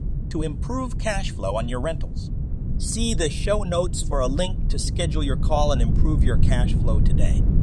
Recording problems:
low rumble; noticeable; throughout; 10 dB below the speech

